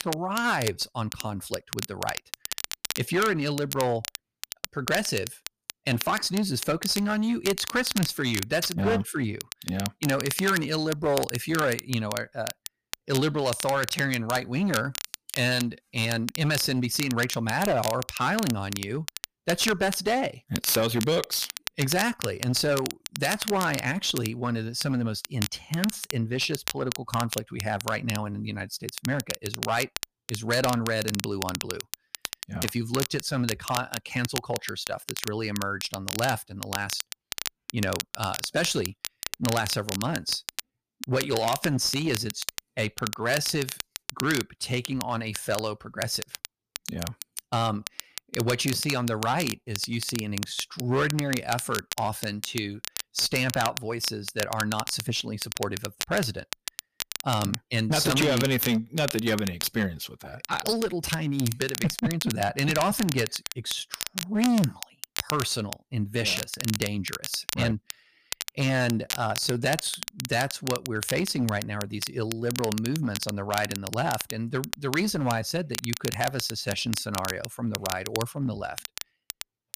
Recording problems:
distortion; slight; 5% of the sound clipped
crackle, like an old record; loud; 7 dB below the speech

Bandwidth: 15 kHz